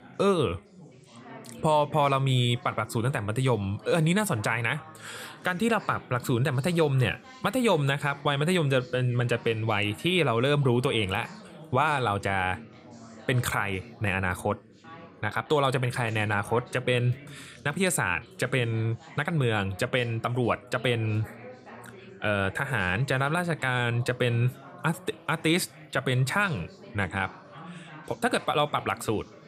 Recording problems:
background chatter; noticeable; throughout; 4 voices, 20 dB below the speech

